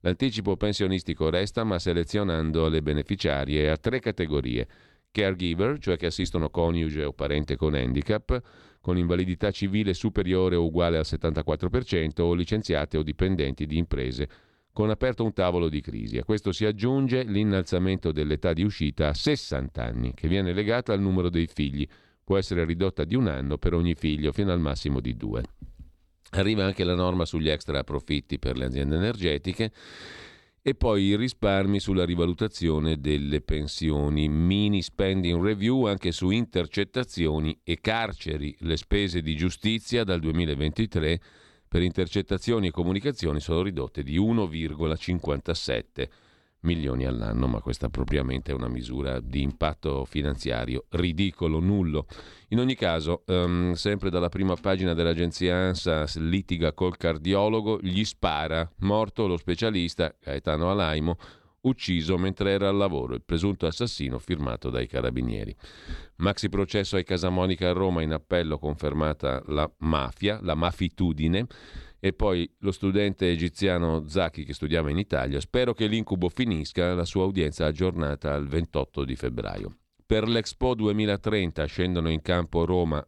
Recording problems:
none

